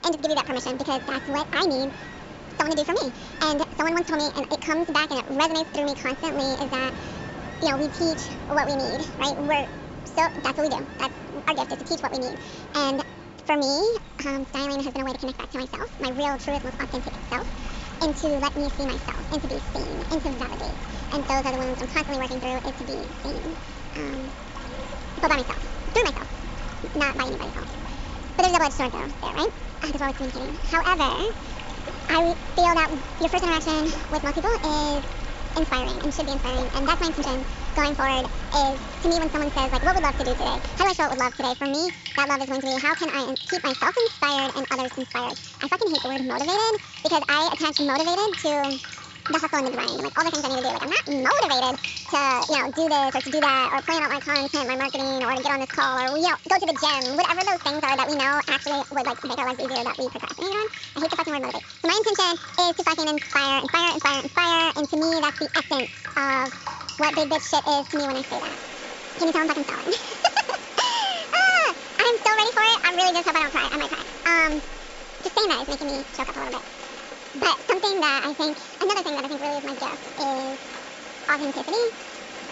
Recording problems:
wrong speed and pitch; too fast and too high; 1.6 times normal speed
high frequencies cut off; noticeable; nothing above 8 kHz
rain or running water; noticeable; throughout; 10 dB below the speech

